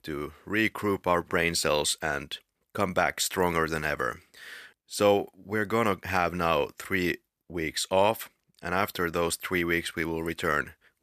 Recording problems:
none

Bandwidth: 14.5 kHz